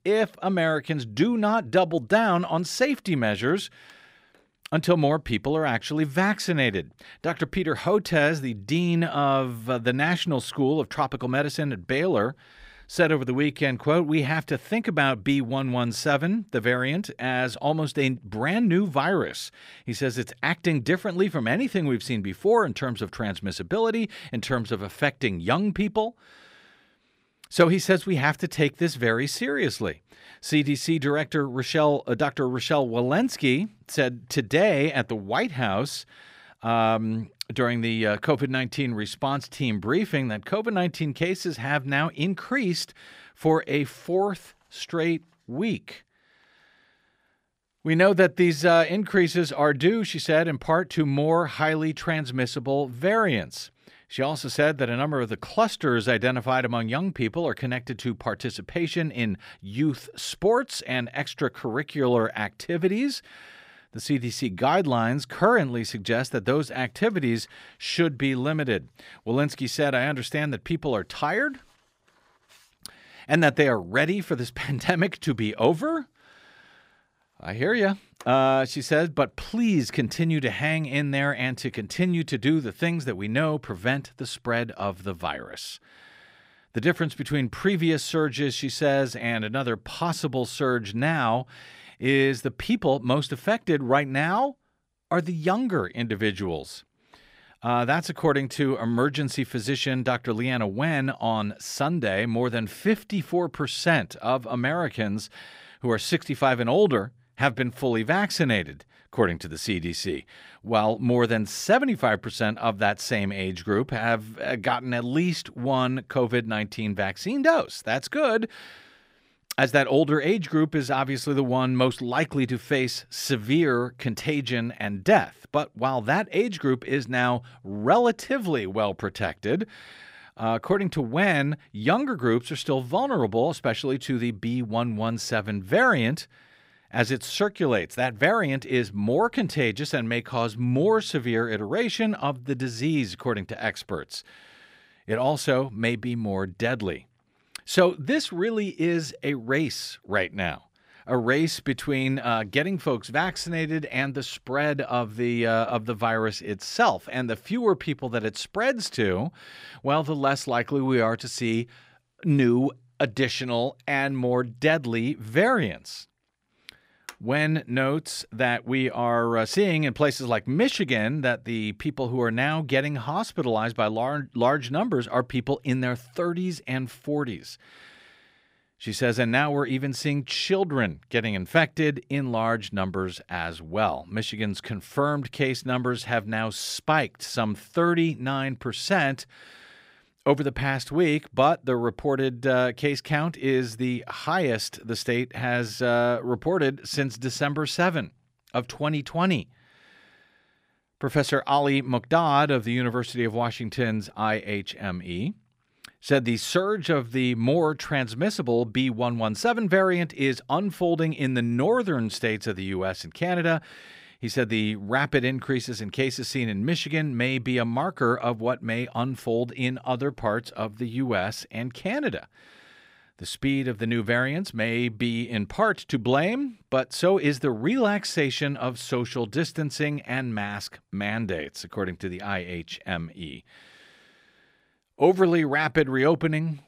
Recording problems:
none

